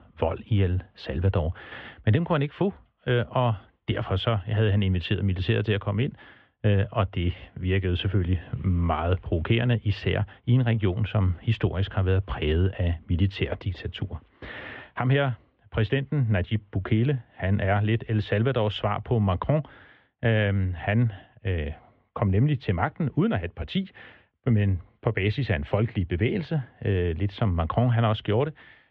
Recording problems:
muffled; very; fading above 3 kHz

